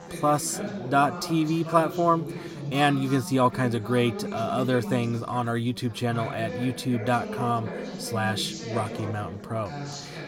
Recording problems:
background chatter; loud; throughout; 4 voices, 9 dB below the speech

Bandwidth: 16 kHz